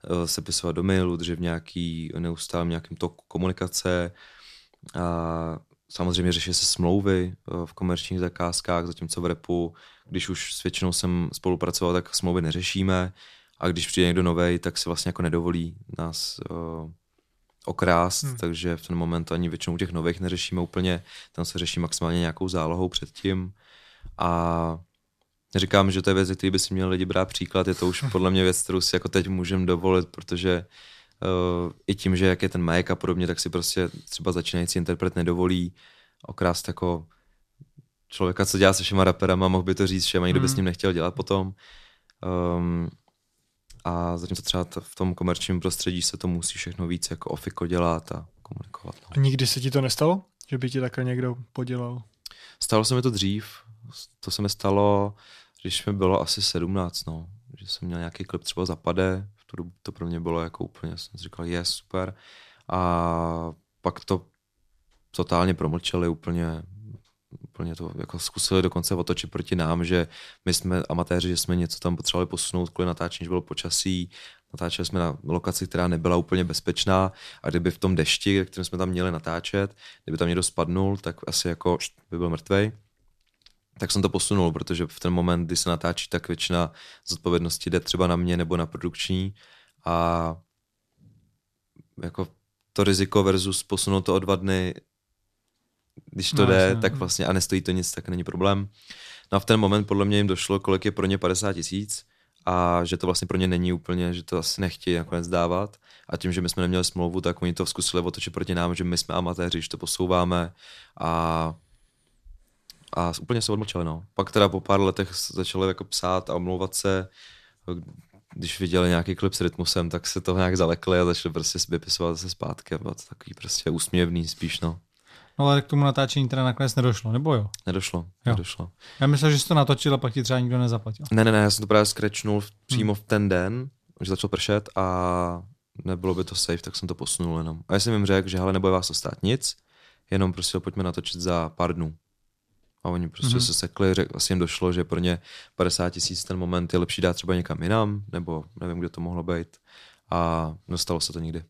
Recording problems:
uneven, jittery; strongly; from 3.5 s to 2:17

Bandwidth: 14 kHz